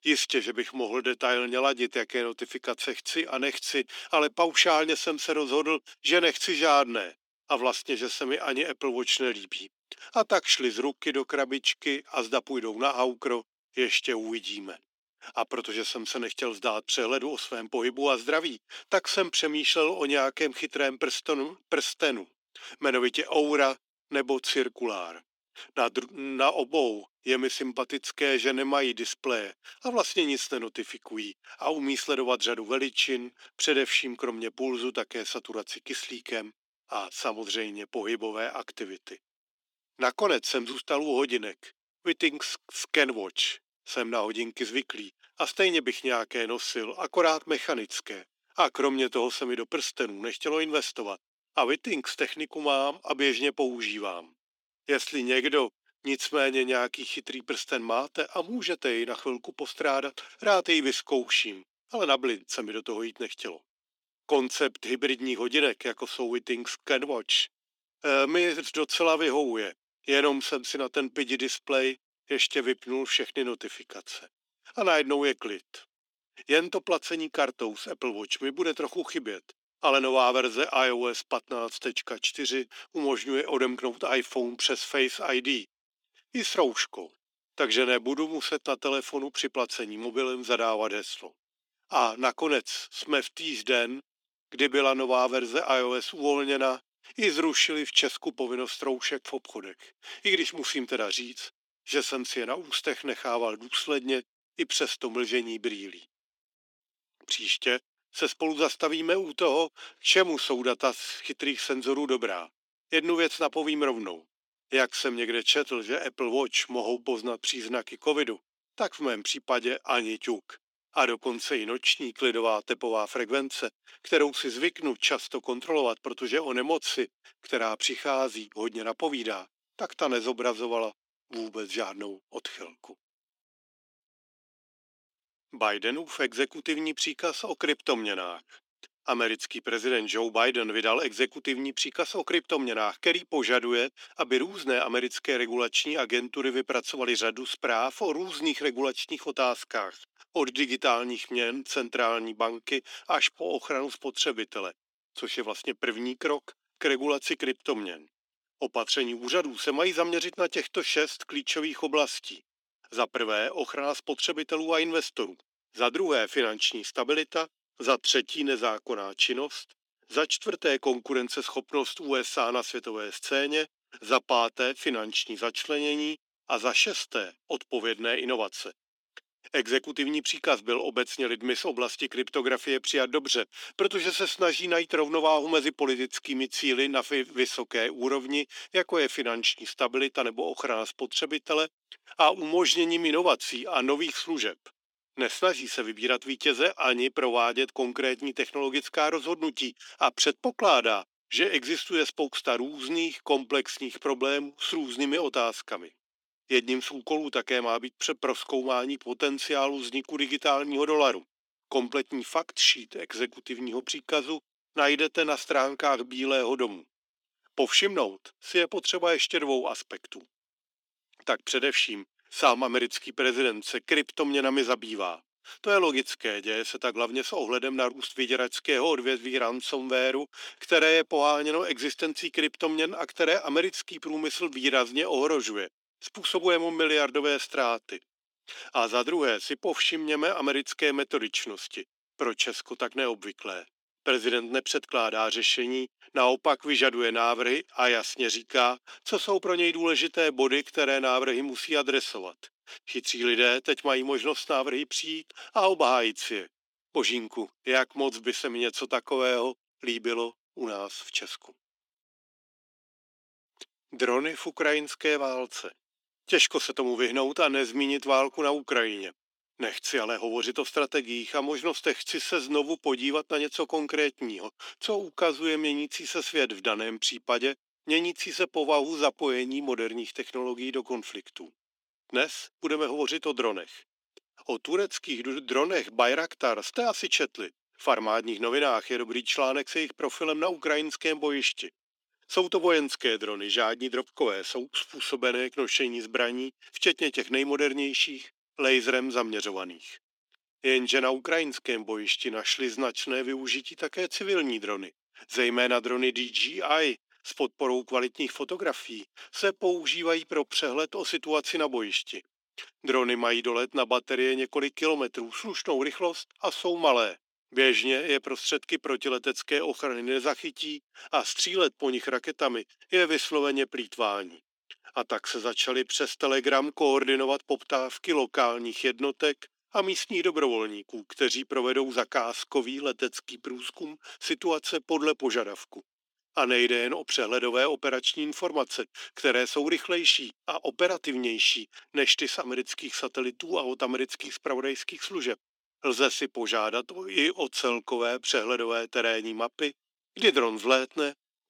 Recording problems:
thin; somewhat; fading below 300 Hz

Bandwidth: 17 kHz